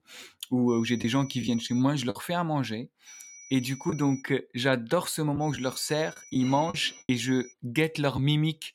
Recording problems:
high-pitched whine; noticeable; from 0.5 to 2 s, from 3 to 4 s and from 5.5 to 7.5 s; 6 kHz, 20 dB below the speech
choppy; occasionally; from 1 to 4 s and from 5.5 to 8 s; 4% of the speech affected

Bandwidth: 17 kHz